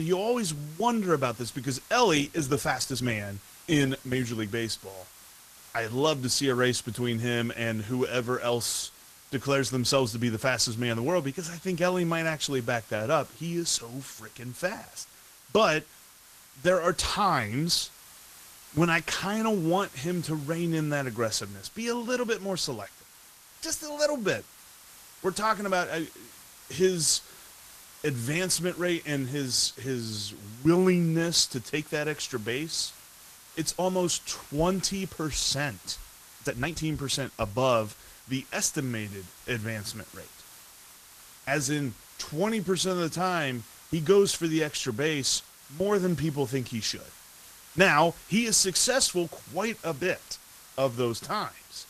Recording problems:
garbled, watery; slightly; nothing above 14.5 kHz
hiss; faint; throughout; 20 dB below the speech
abrupt cut into speech; at the start
uneven, jittery; strongly; from 2.5 to 37 s

